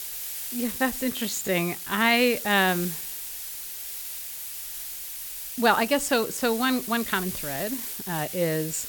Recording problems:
hiss; loud; throughout; 7 dB below the speech
uneven, jittery; strongly; from 0.5 to 8.5 s

